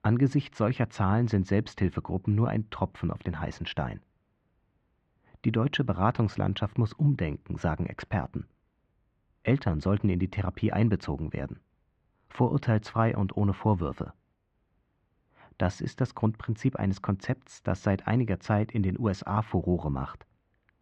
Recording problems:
muffled; very; fading above 2.5 kHz

